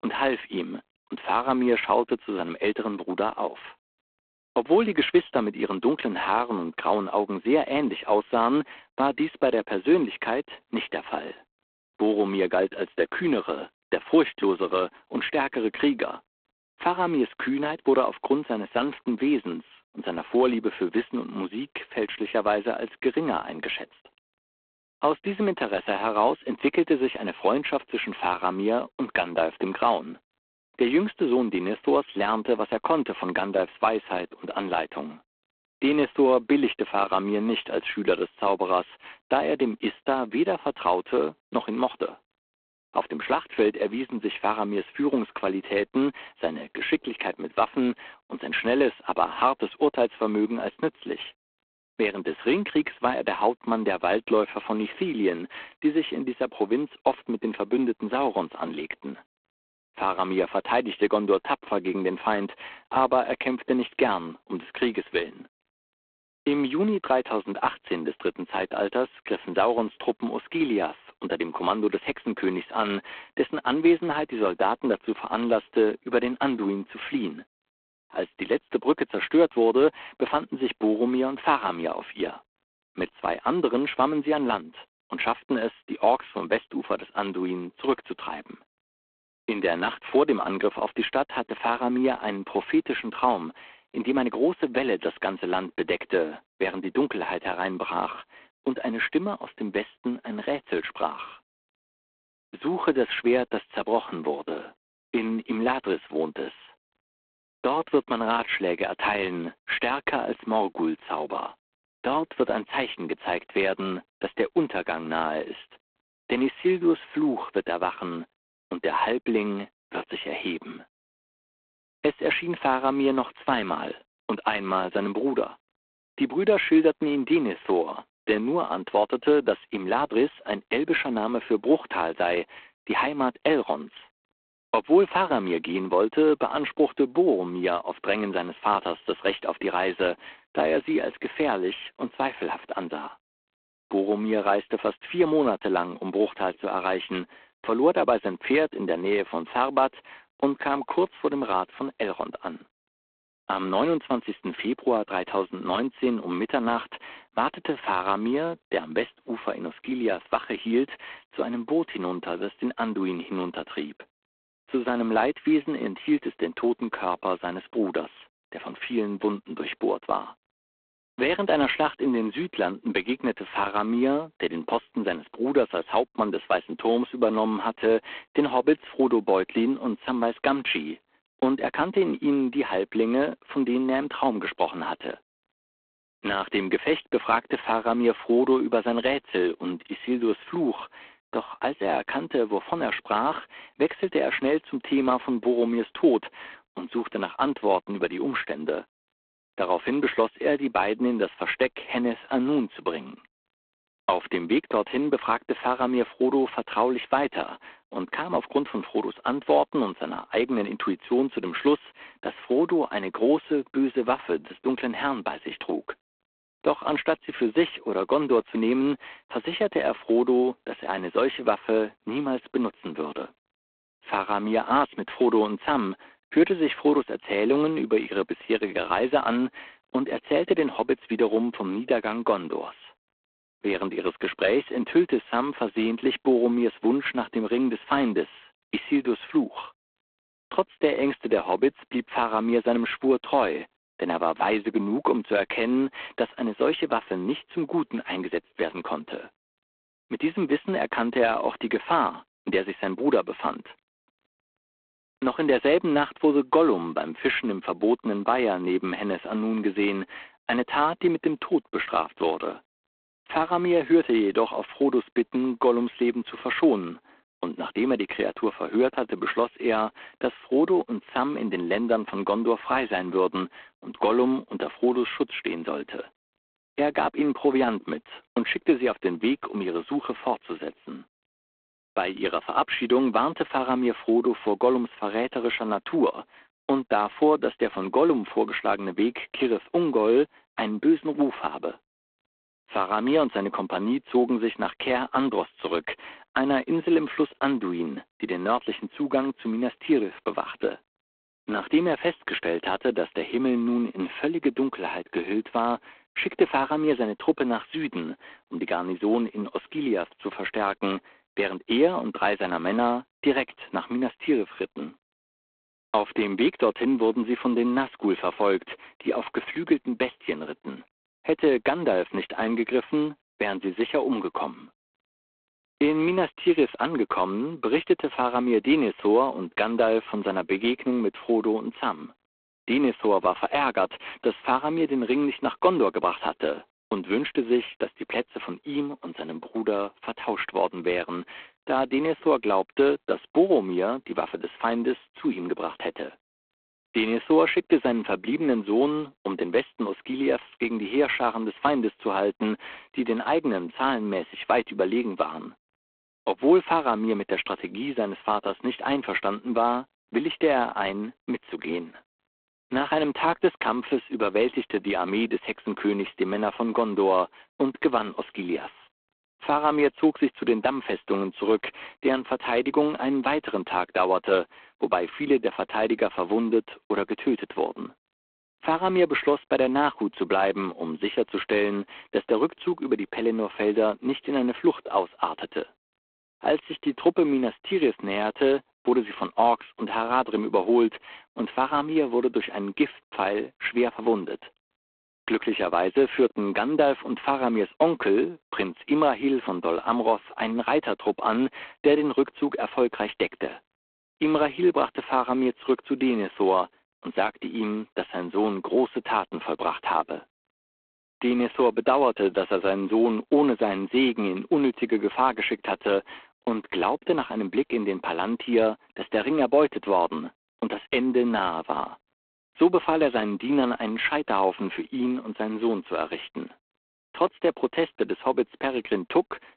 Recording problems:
phone-call audio; poor line

